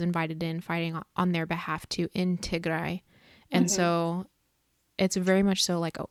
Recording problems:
abrupt cut into speech; at the start

